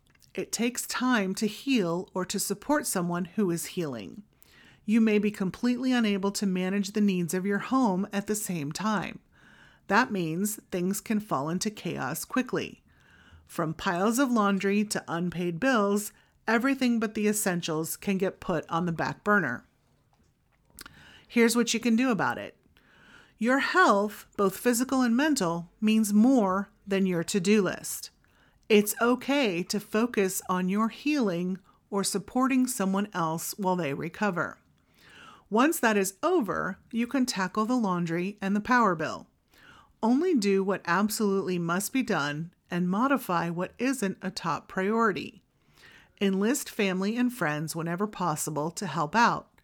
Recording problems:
none

